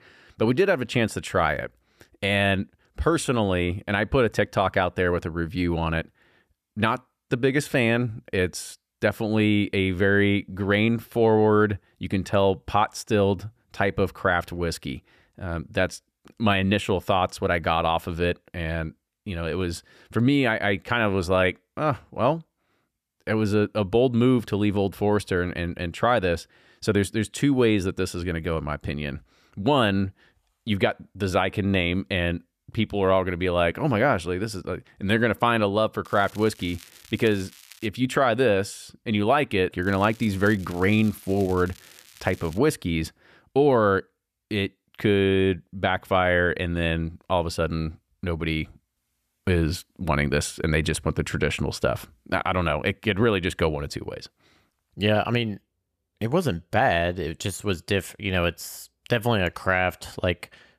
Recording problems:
crackling; faint; from 36 to 38 s and from 40 to 43 s; 25 dB below the speech

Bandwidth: 14.5 kHz